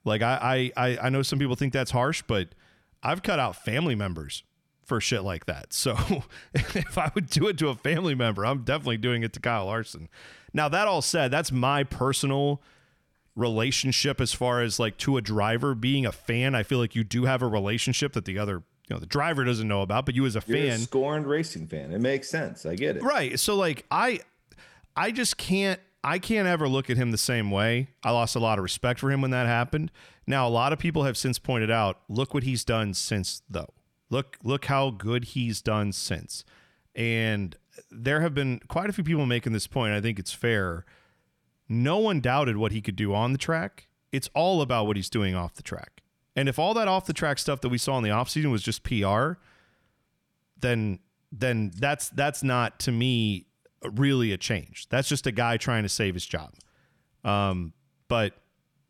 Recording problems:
none

